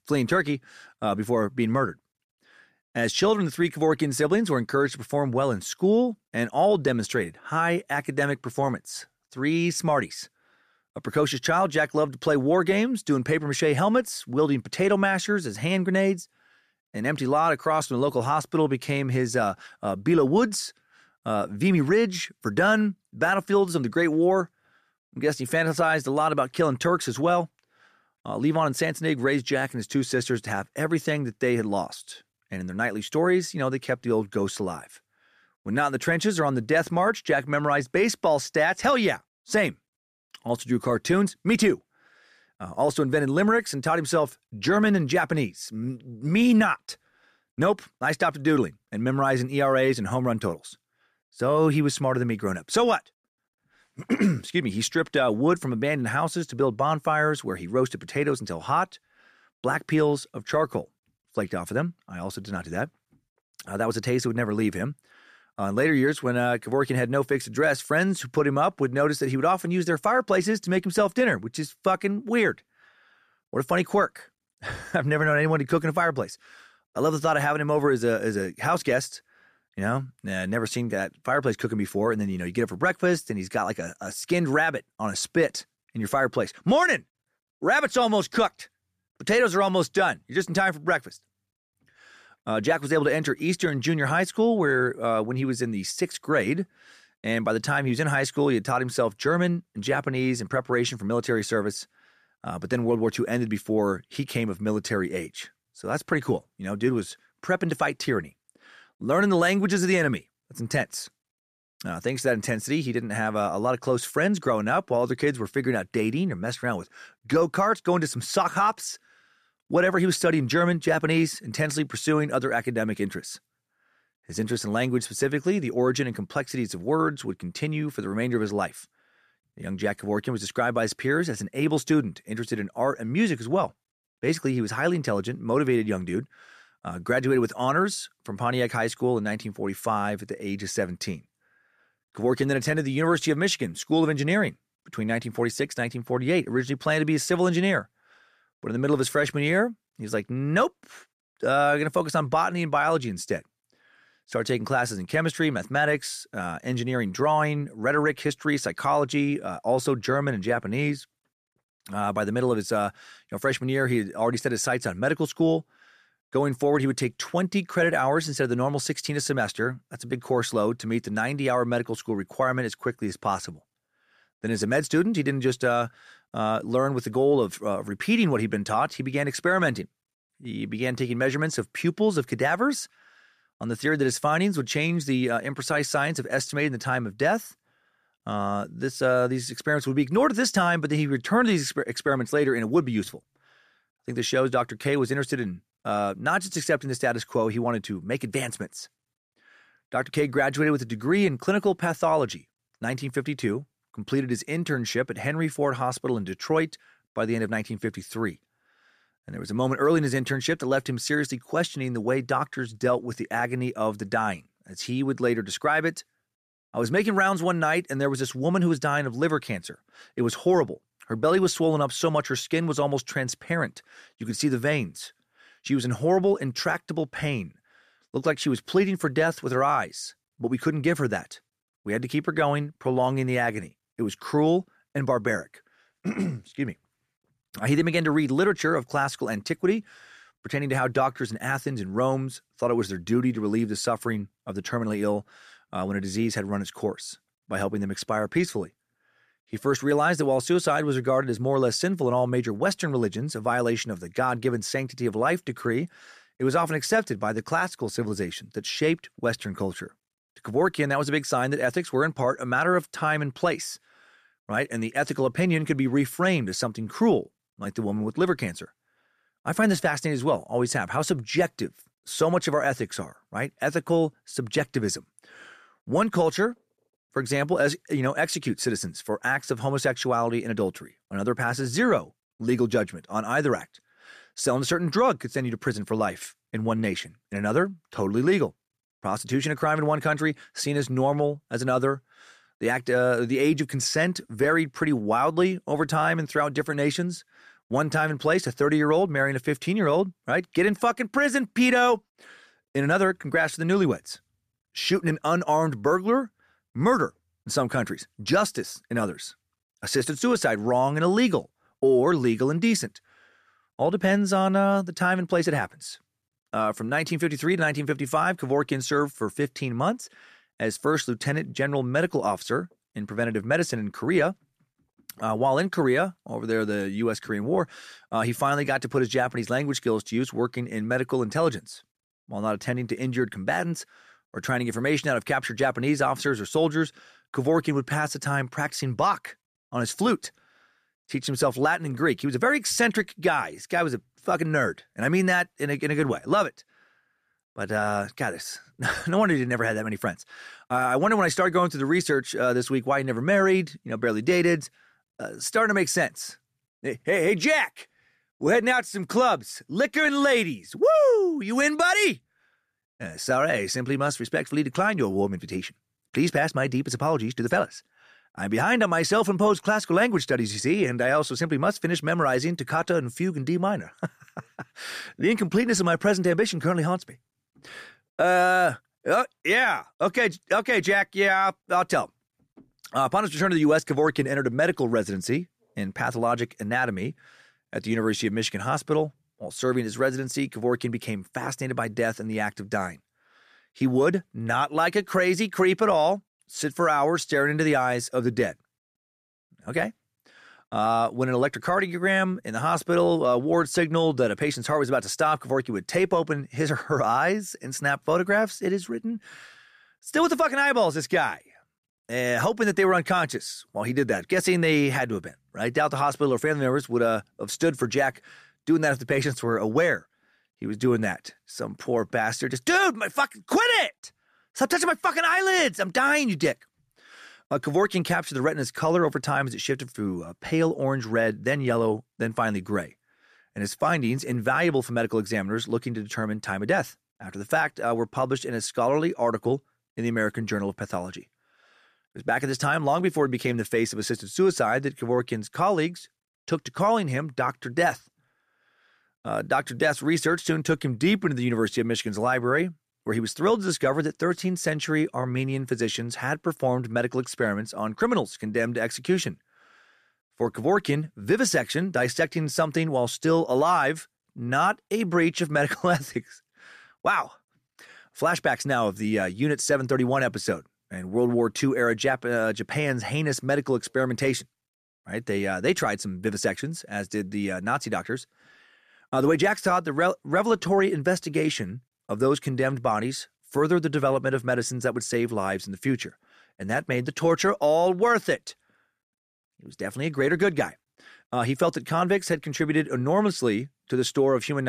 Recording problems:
abrupt cut into speech; at the end

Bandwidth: 14.5 kHz